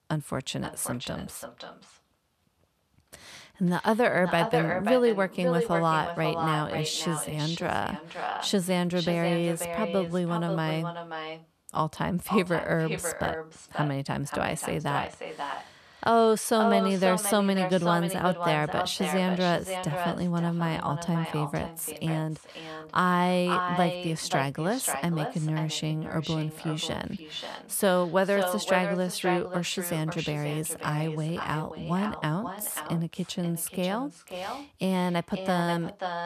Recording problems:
echo of what is said; strong; throughout; 530 ms later, 7 dB below the speech

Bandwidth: 14 kHz